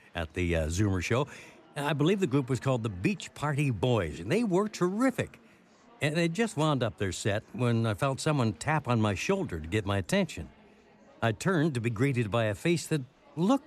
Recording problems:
murmuring crowd; faint; throughout; 30 dB below the speech

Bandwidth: 13.5 kHz